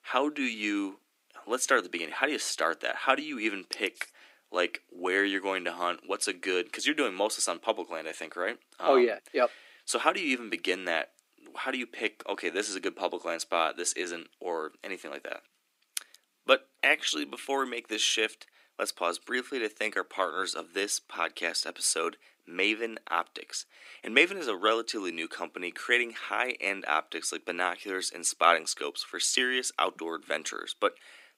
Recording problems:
thin; somewhat; fading below 300 Hz

